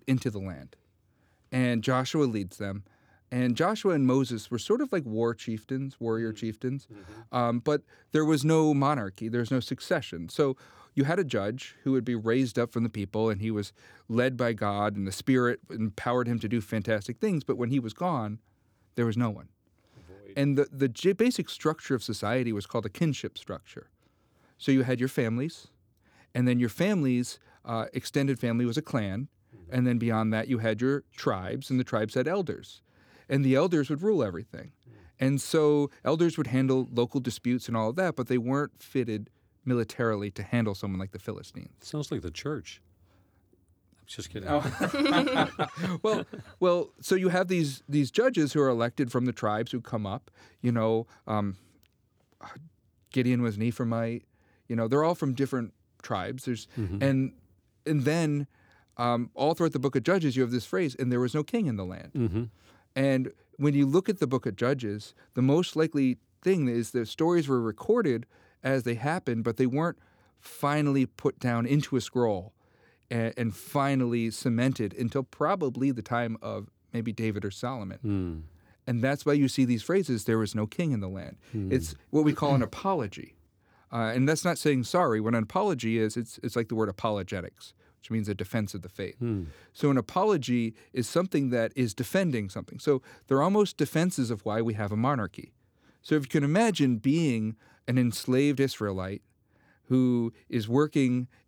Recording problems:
none

